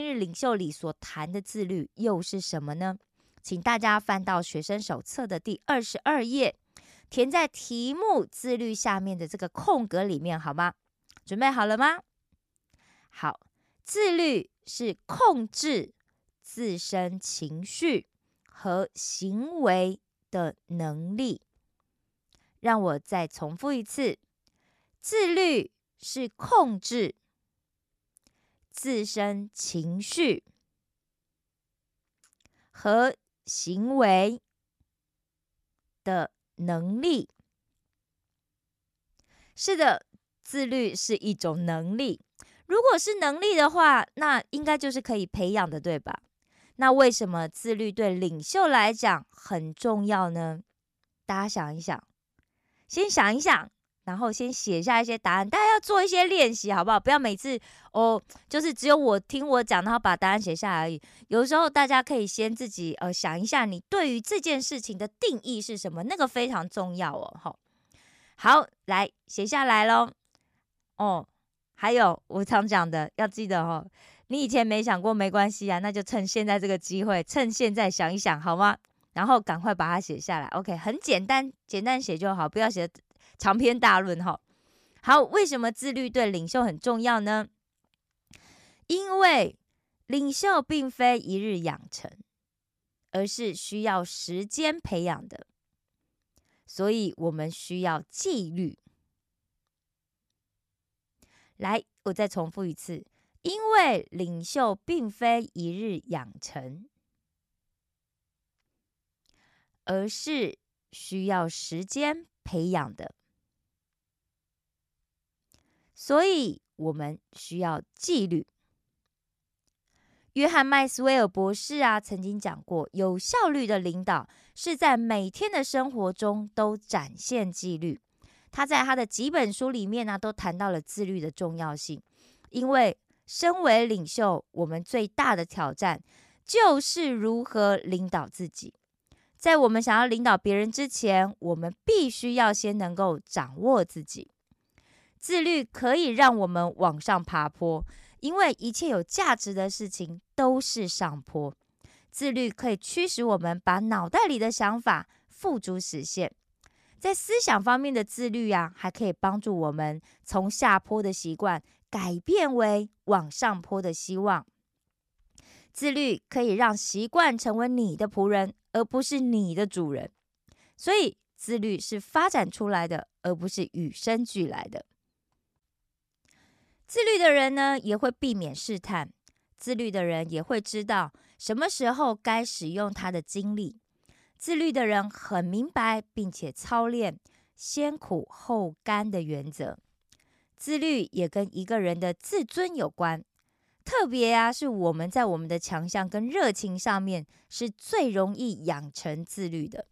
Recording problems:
abrupt cut into speech; at the start

